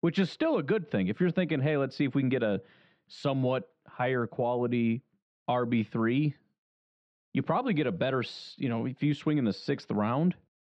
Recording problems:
muffled; slightly; fading above 3.5 kHz

